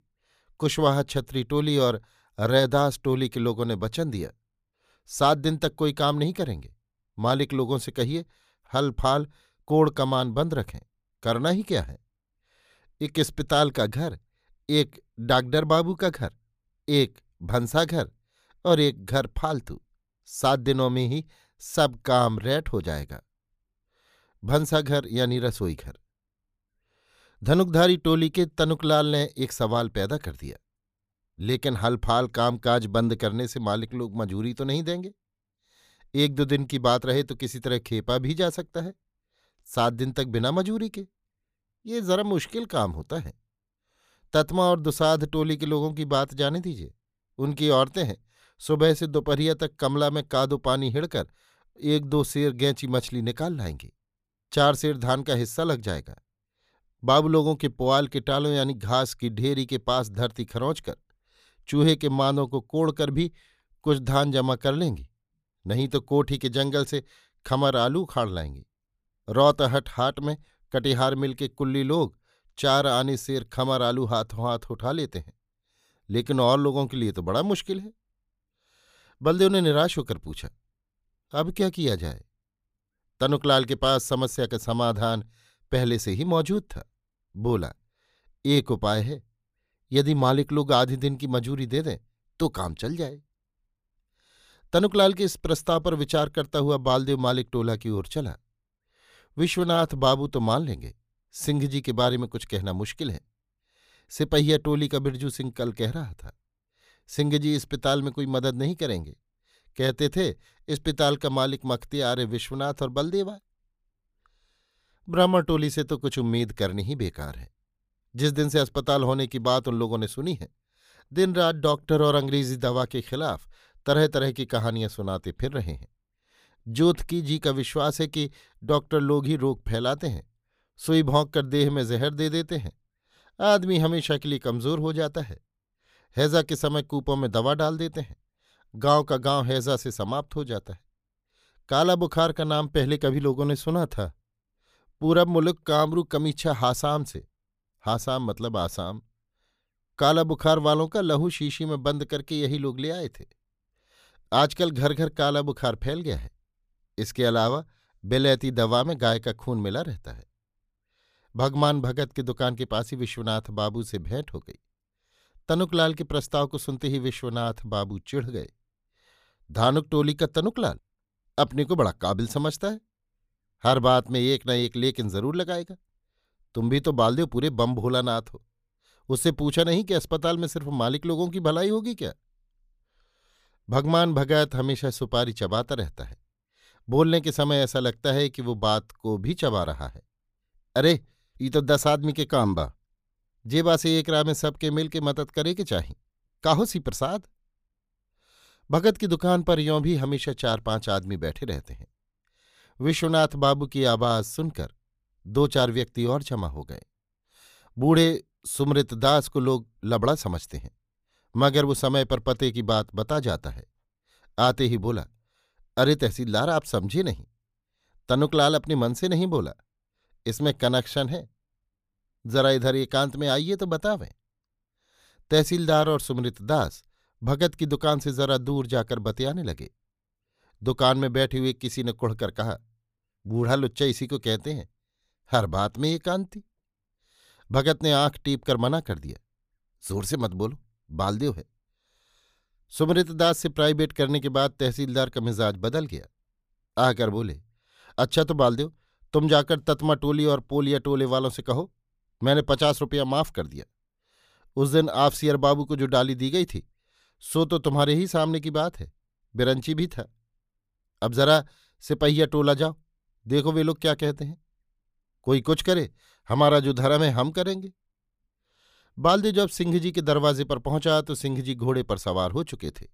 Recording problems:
none

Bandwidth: 15 kHz